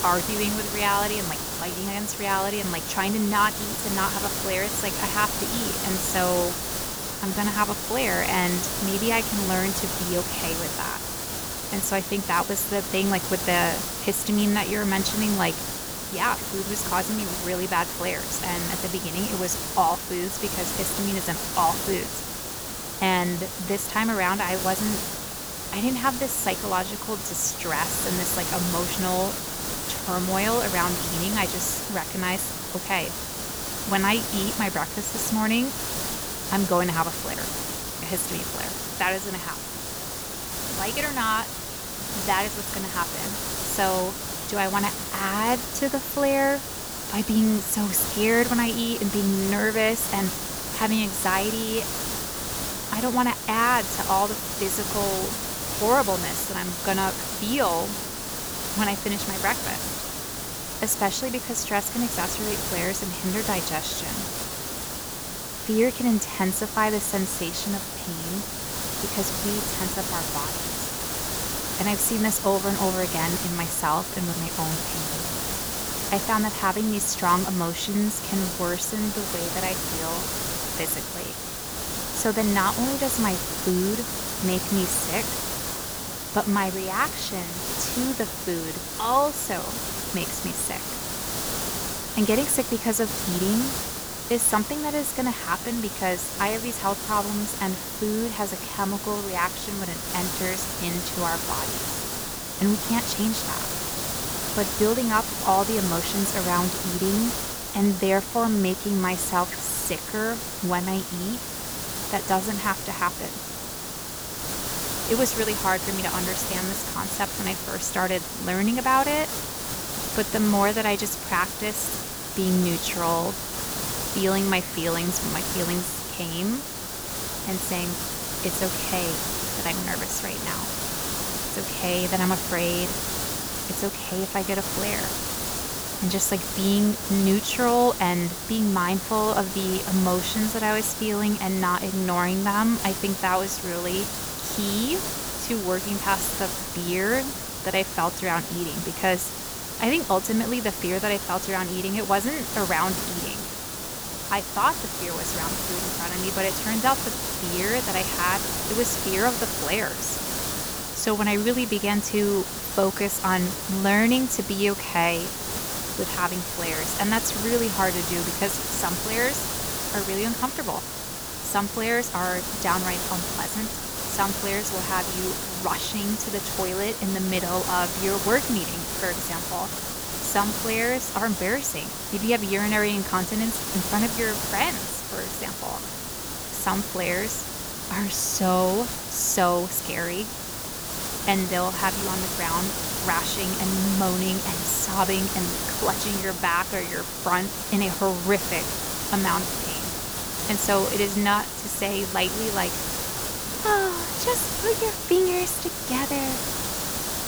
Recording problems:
hiss; loud; throughout; 2 dB below the speech

